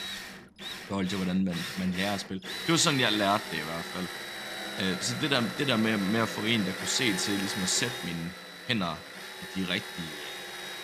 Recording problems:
machinery noise; loud; throughout; 7 dB below the speech

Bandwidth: 14.5 kHz